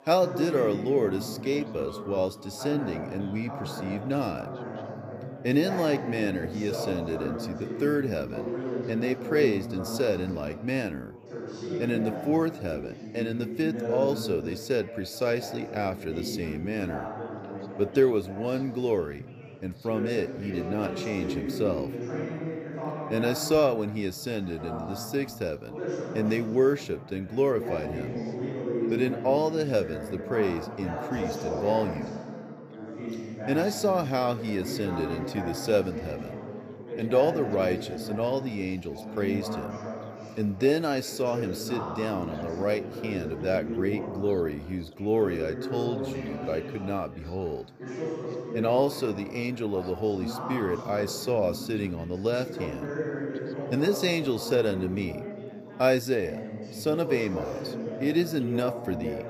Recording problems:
background chatter; loud; throughout; 4 voices, 7 dB below the speech

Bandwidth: 14.5 kHz